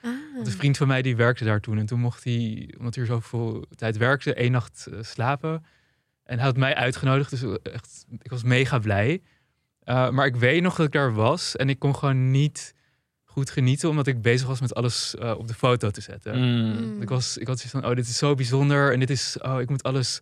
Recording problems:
none

